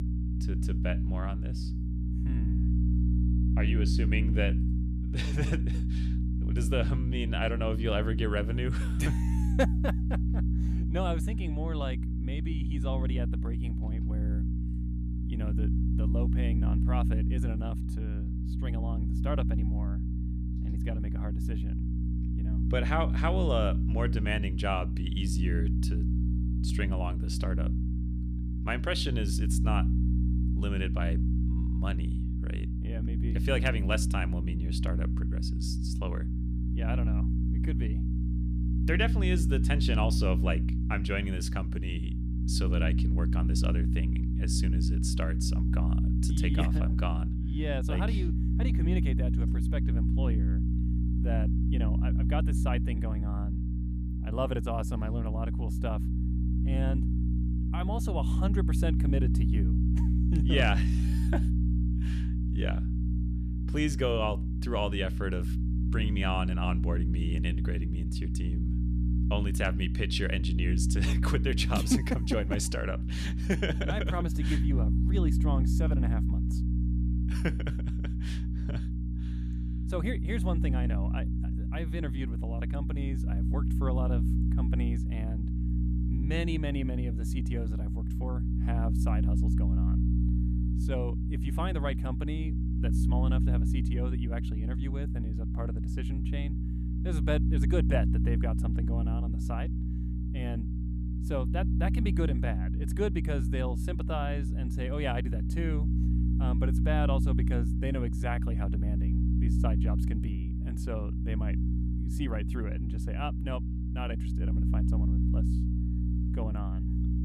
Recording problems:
electrical hum; loud; throughout; 60 Hz, 5 dB below the speech

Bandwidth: 14.5 kHz